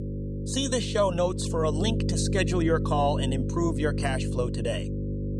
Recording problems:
electrical hum; loud; throughout; 50 Hz, 9 dB below the speech

